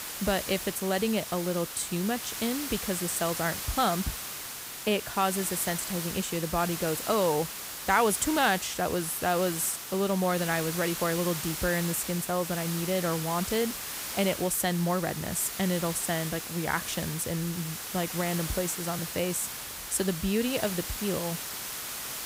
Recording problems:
hiss; loud; throughout; 5 dB below the speech

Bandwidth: 15.5 kHz